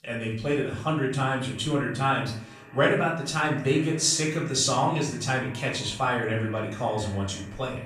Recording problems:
off-mic speech; far
room echo; noticeable; dies away in 0.5 s
echo of what is said; faint; throughout; 210 ms later, 20 dB below the speech

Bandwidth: 15 kHz